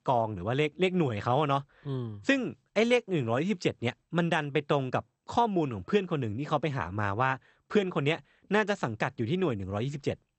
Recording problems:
garbled, watery; slightly; nothing above 8 kHz

